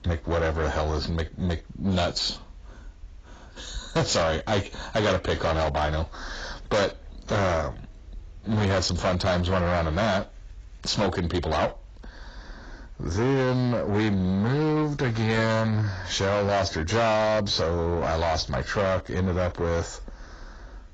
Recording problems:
distortion; heavy; 6 dB below the speech
garbled, watery; badly; nothing above 7.5 kHz

